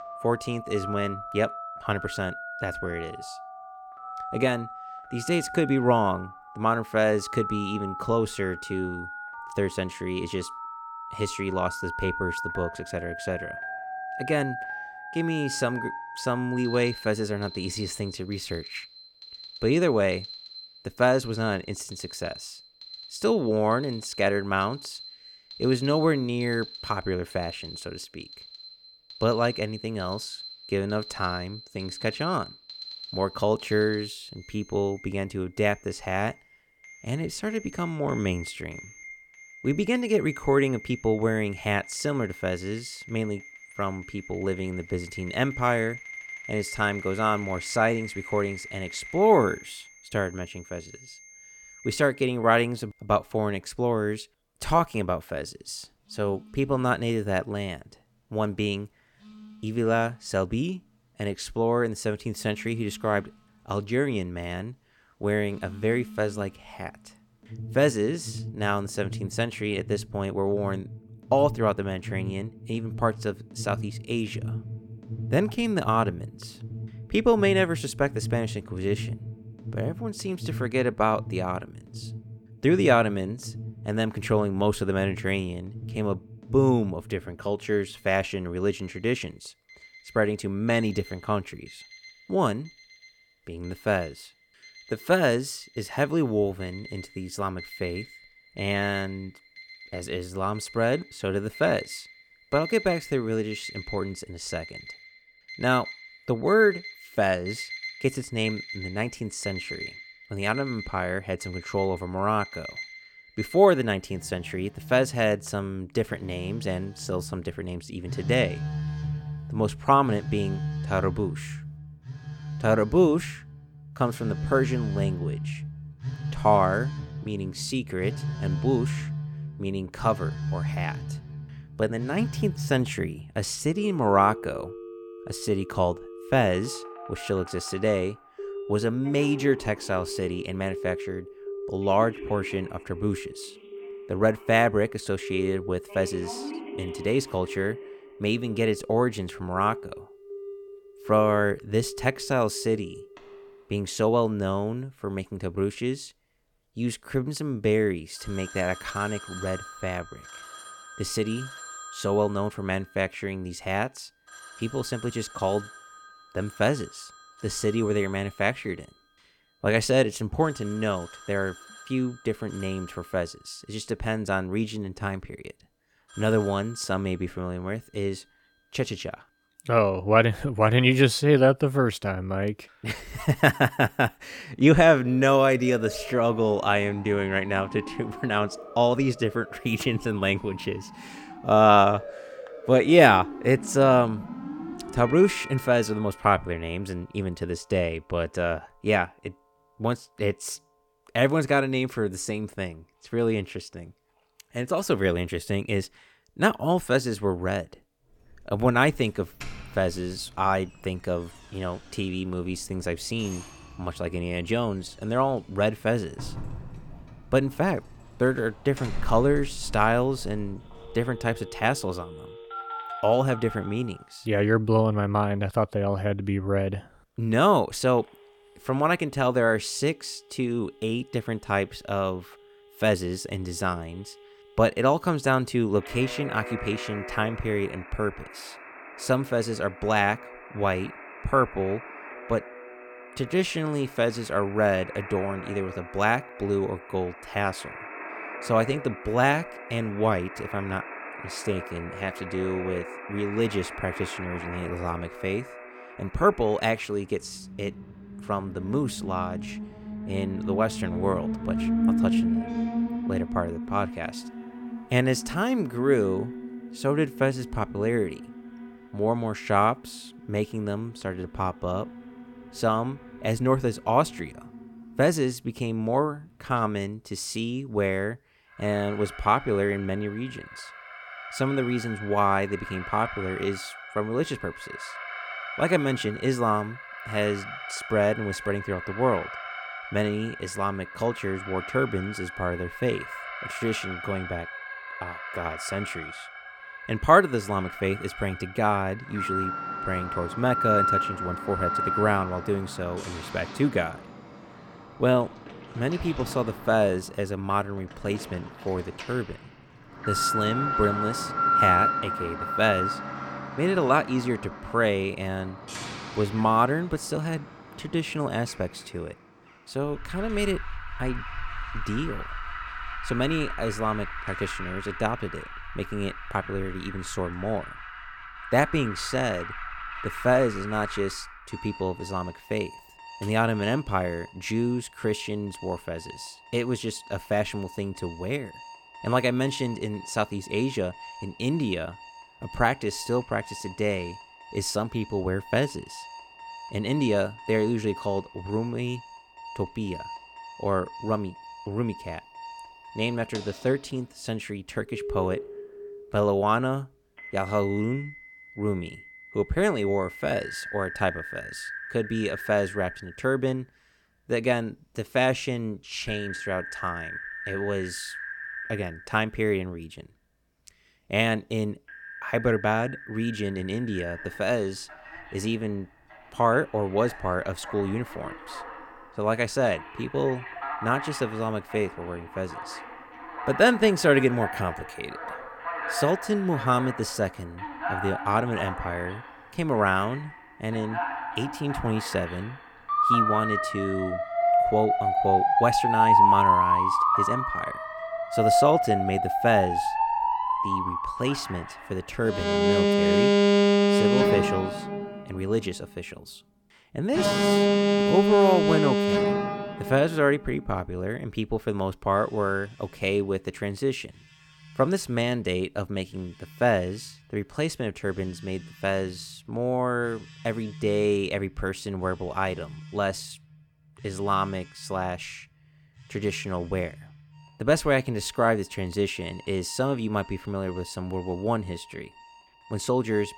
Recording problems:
alarms or sirens; loud; throughout; 6 dB below the speech

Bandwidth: 18 kHz